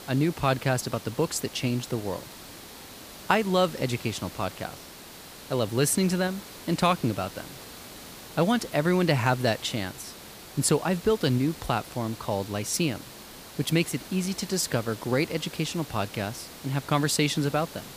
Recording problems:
hiss; noticeable; throughout; 15 dB below the speech

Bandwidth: 15 kHz